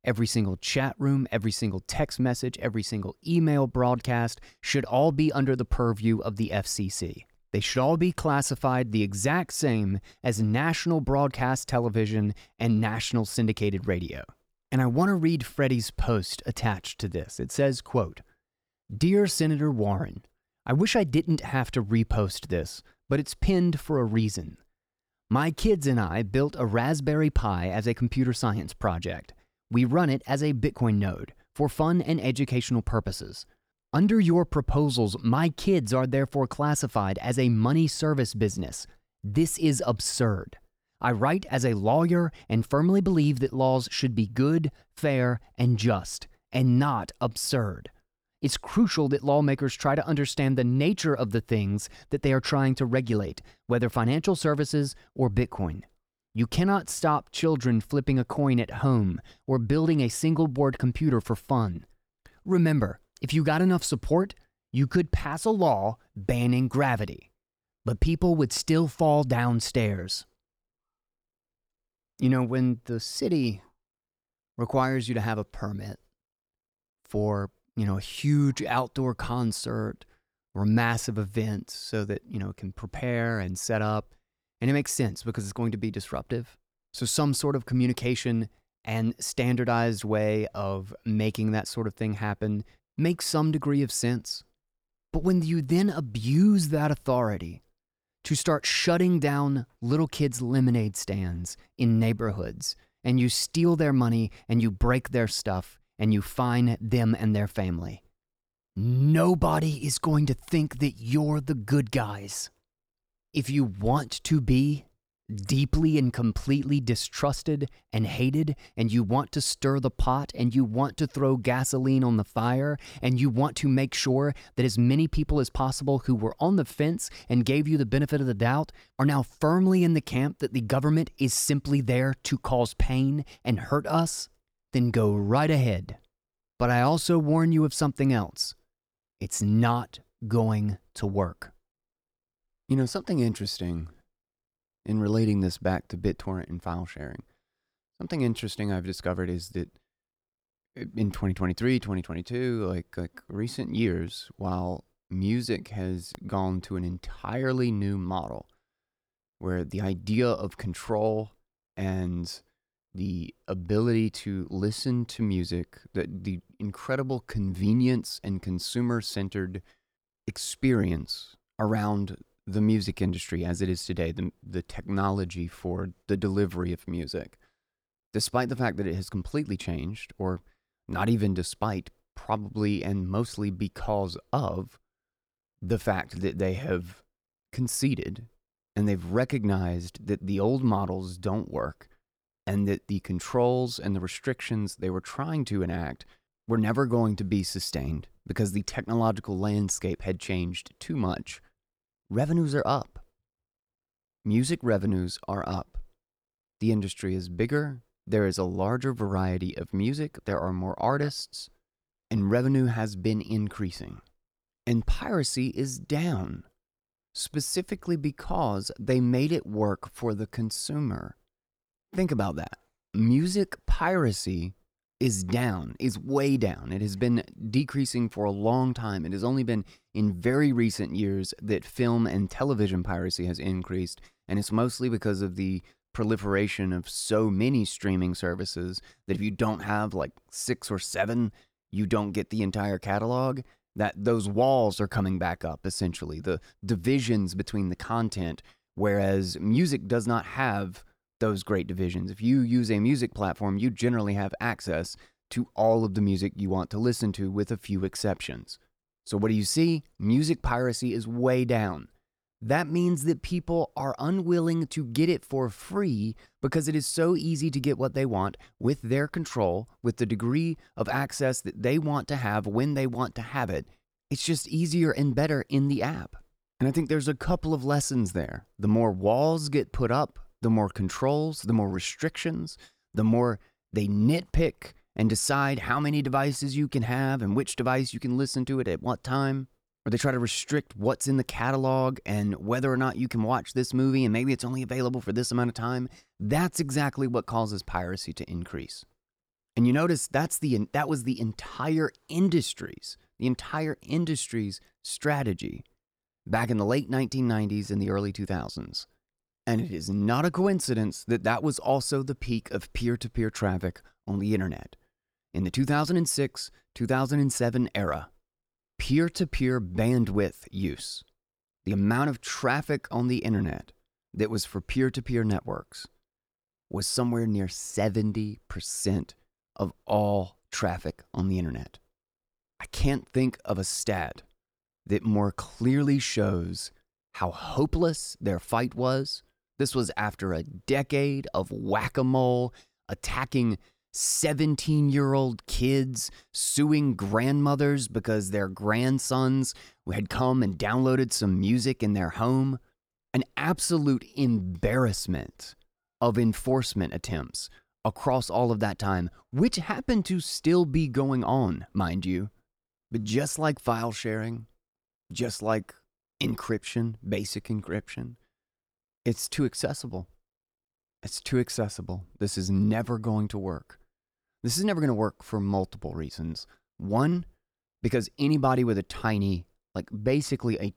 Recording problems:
none

